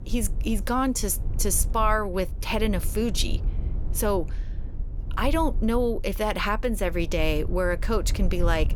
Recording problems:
low rumble; faint; throughout; 20 dB below the speech

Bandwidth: 18 kHz